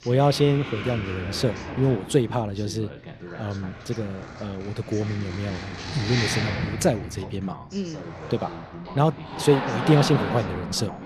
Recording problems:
household noises; loud; throughout; 7 dB below the speech
voice in the background; noticeable; throughout; 15 dB below the speech

